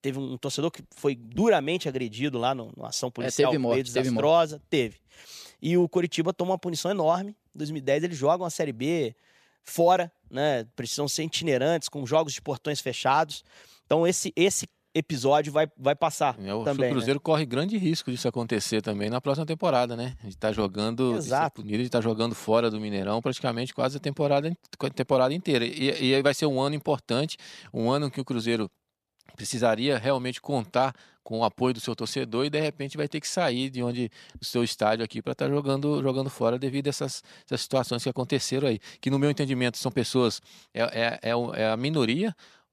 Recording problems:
none

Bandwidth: 14.5 kHz